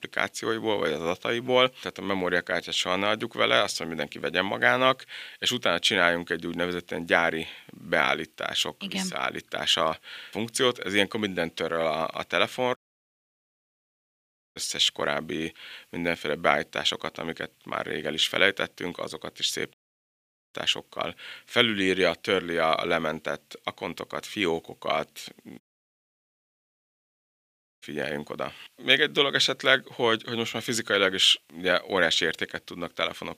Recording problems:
thin; somewhat; fading below 800 Hz
audio cutting out; at 13 s for 2 s, at 20 s for 1 s and at 26 s for 2 s

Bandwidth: 15 kHz